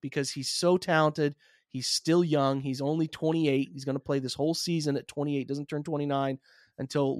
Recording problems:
abrupt cut into speech; at the end

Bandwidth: 14.5 kHz